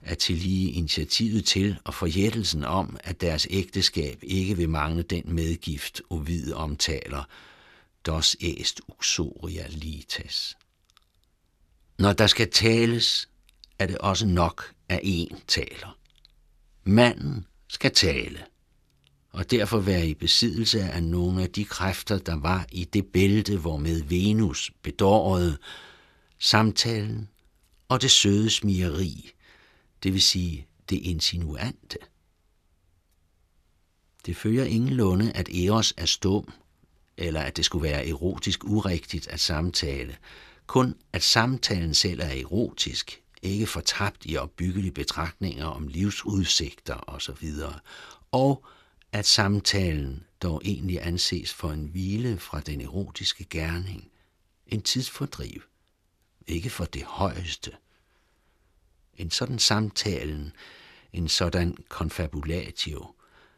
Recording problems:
none

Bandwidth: 14 kHz